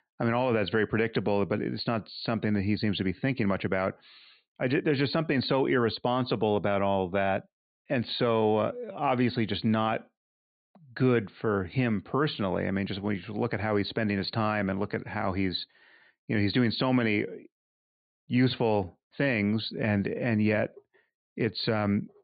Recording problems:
high frequencies cut off; severe; nothing above 4.5 kHz

